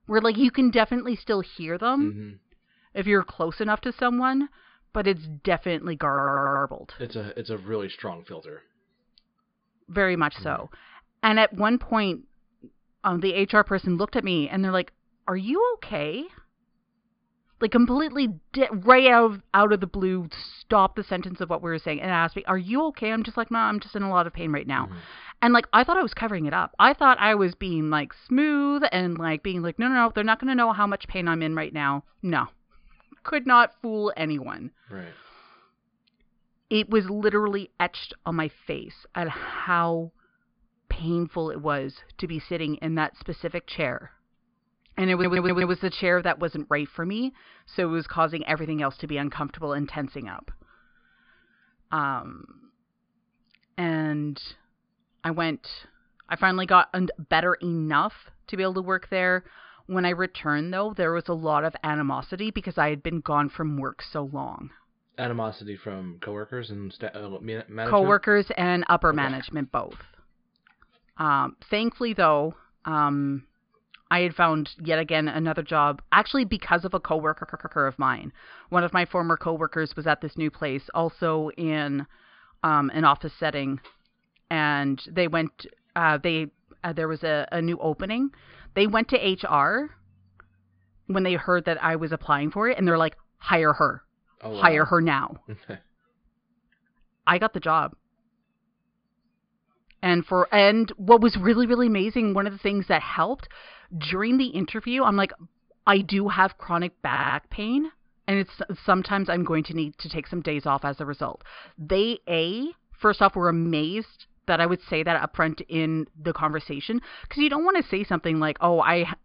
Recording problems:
high frequencies cut off; severe; nothing above 5 kHz
audio stuttering; 4 times, first at 6 s

